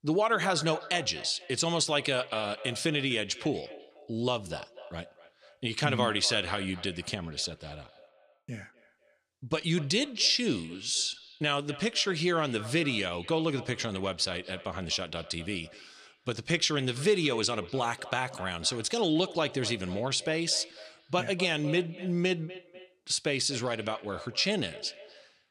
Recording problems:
echo of what is said; noticeable; throughout; 250 ms later, 15 dB below the speech

